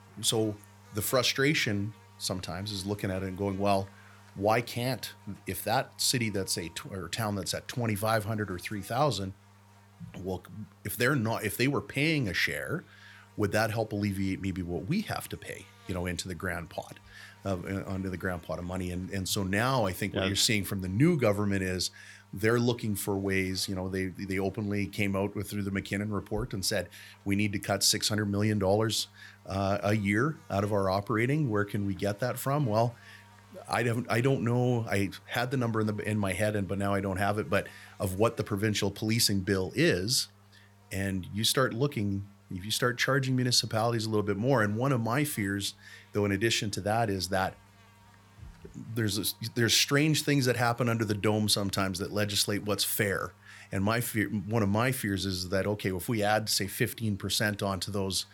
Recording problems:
electrical hum; faint; throughout; 50 Hz, 30 dB below the speech

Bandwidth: 17 kHz